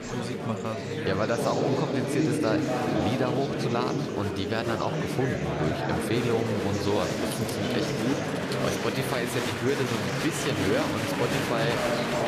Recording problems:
murmuring crowd; very loud; throughout; 2 dB above the speech
jangling keys; noticeable; from 7.5 to 8.5 s; peak 9 dB below the speech

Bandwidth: 14.5 kHz